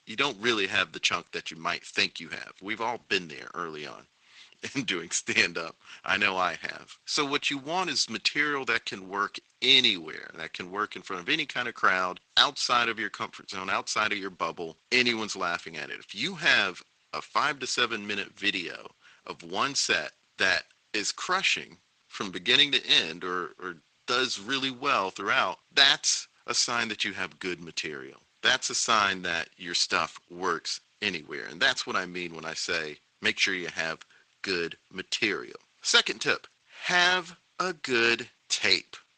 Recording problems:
thin; somewhat; fading below 850 Hz
garbled, watery; slightly; nothing above 8 kHz

